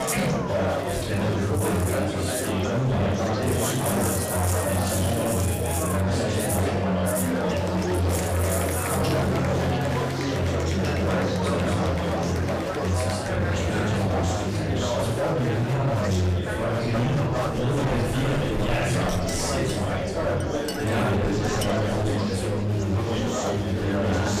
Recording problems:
off-mic speech; far
room echo; noticeable; dies away in 0.7 s
distortion; slight; 20% of the sound clipped
murmuring crowd; very loud; throughout; 1 dB above the speech
background music; loud; throughout; 5 dB below the speech
clattering dishes; noticeable; from 19 to 22 s; peak 7 dB below the speech

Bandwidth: 15 kHz